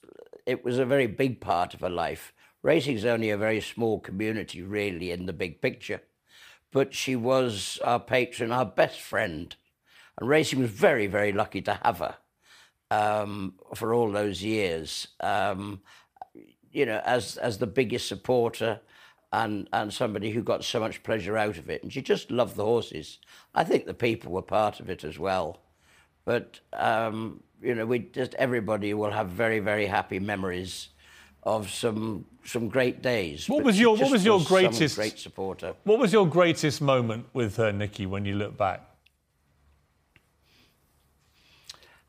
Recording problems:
none

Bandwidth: 15 kHz